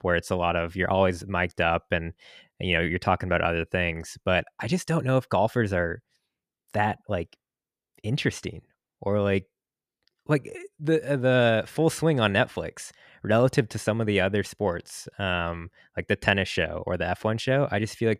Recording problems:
none

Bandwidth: 14.5 kHz